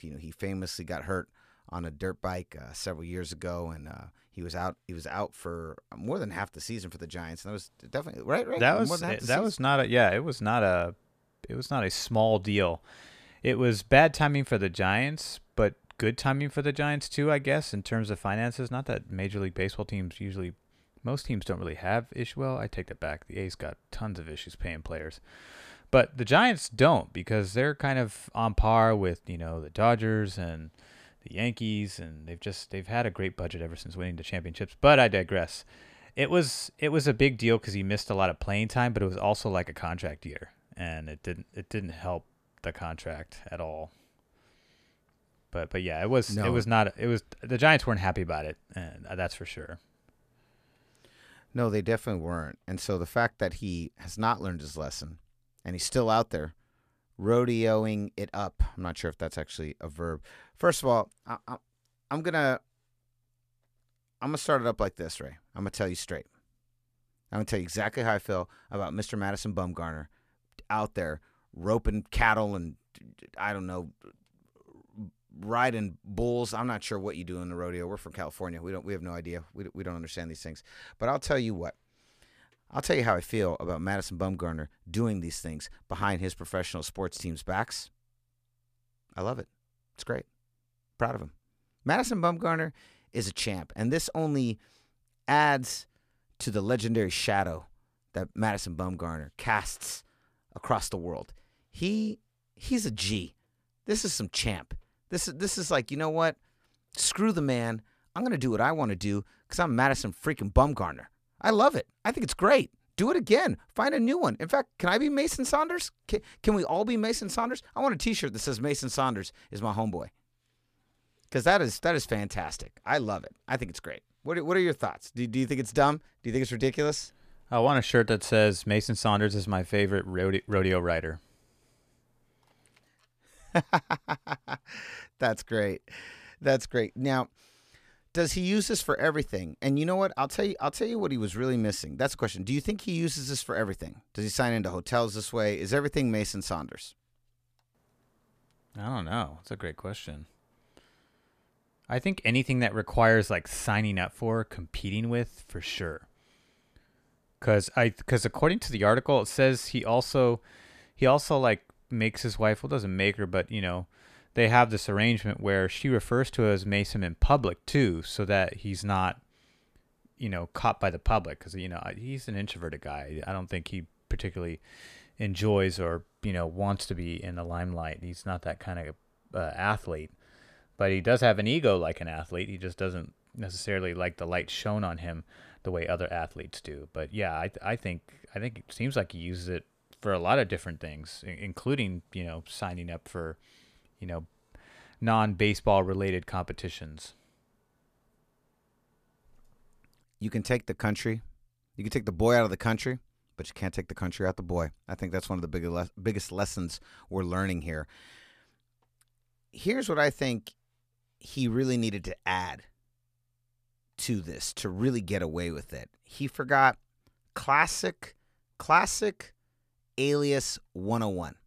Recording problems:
none

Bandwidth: 14.5 kHz